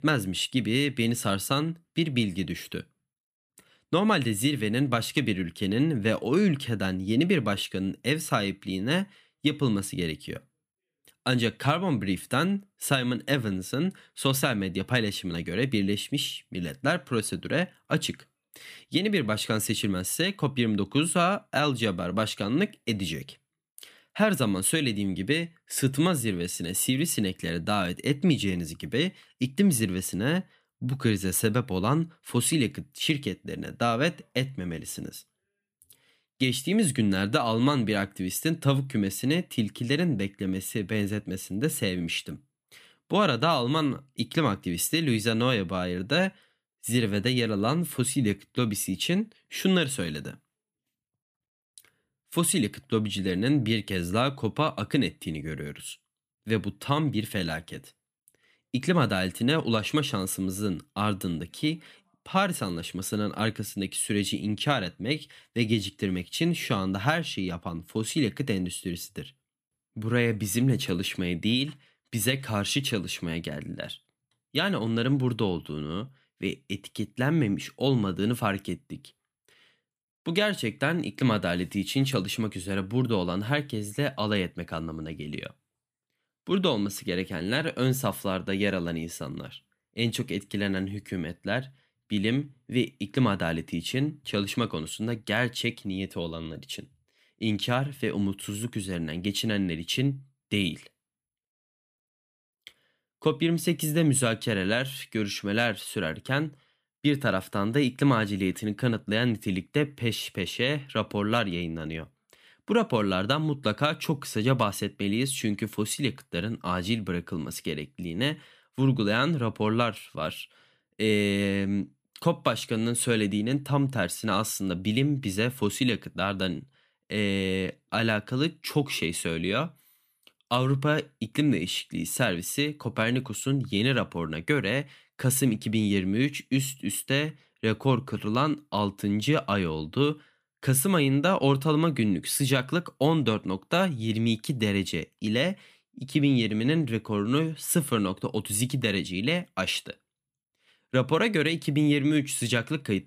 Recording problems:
none

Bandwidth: 14.5 kHz